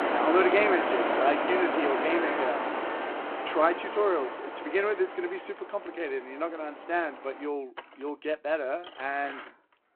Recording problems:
phone-call audio
traffic noise; loud; throughout; 1 dB below the speech

